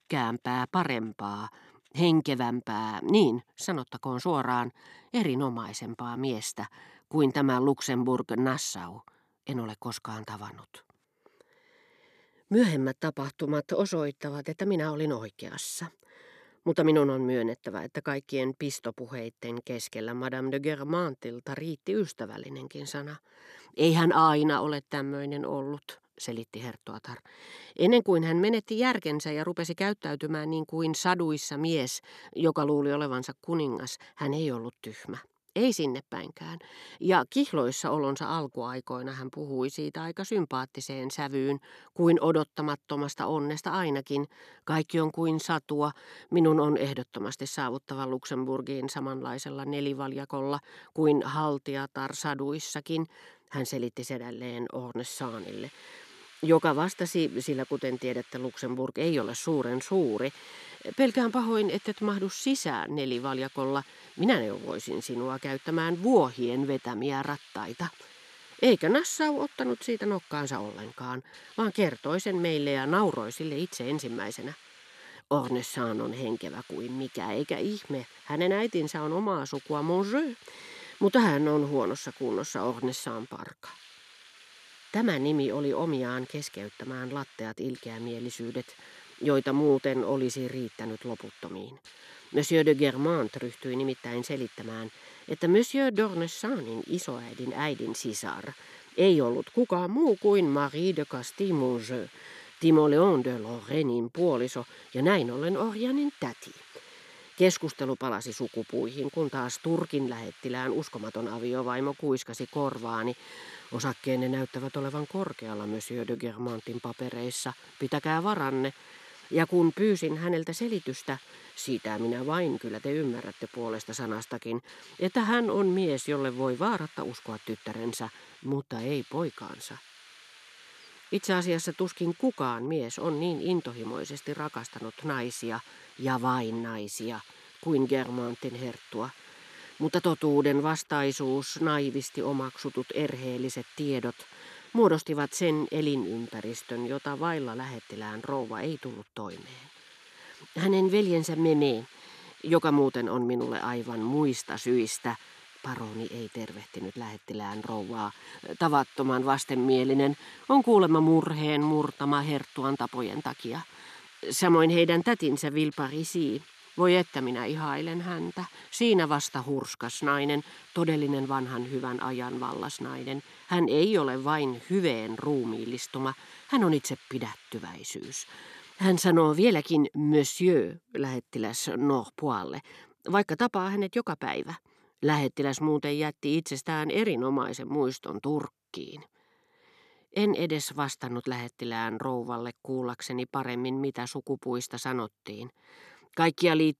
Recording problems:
hiss; faint; from 55 s to 2:59; 20 dB below the speech

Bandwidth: 13.5 kHz